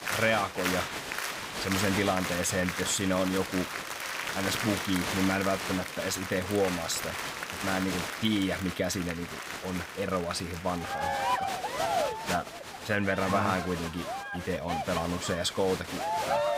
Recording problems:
crowd noise; loud; throughout; 3 dB below the speech

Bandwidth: 15.5 kHz